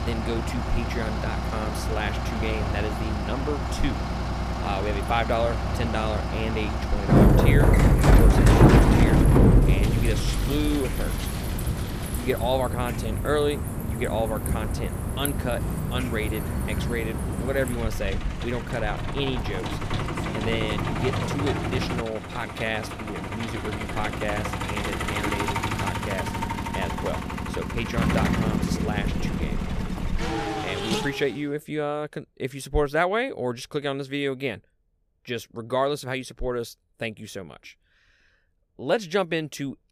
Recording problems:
traffic noise; very loud; until 31 s; 5 dB above the speech

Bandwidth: 14.5 kHz